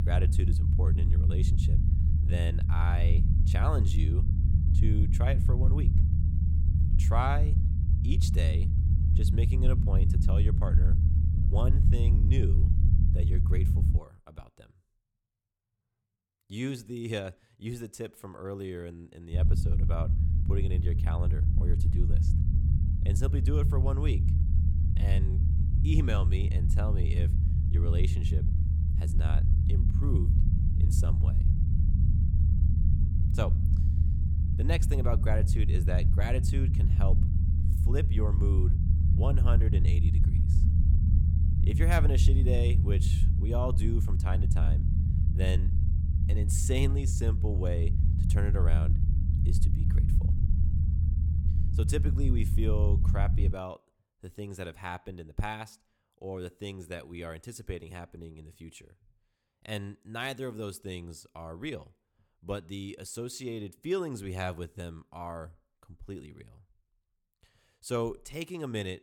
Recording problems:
low rumble; loud; until 14 s and from 19 to 54 s; 3 dB below the speech

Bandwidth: 17.5 kHz